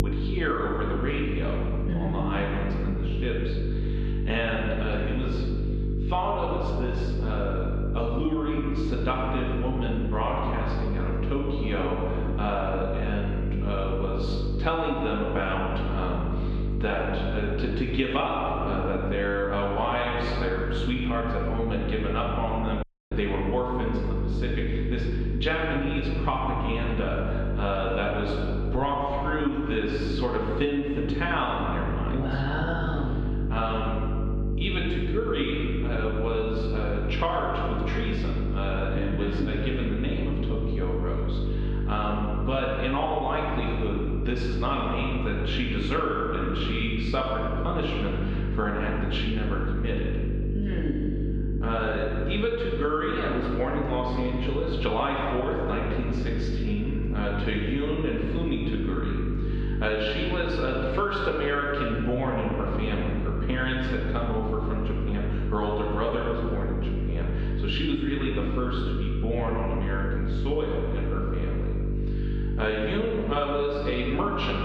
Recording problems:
off-mic speech; far
room echo; noticeable; dies away in 1.6 s
muffled; slightly; fading above 3.5 kHz
squashed, flat; somewhat
electrical hum; noticeable; throughout; 50 Hz, 10 dB below the speech
audio cutting out; at 23 s

